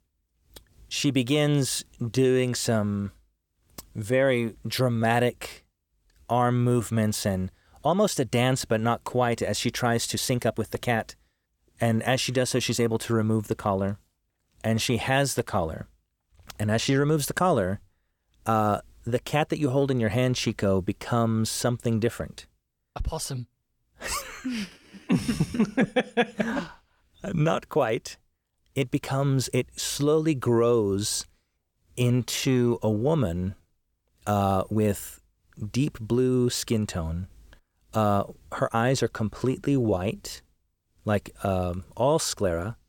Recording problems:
uneven, jittery; strongly; from 2 to 41 s

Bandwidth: 17.5 kHz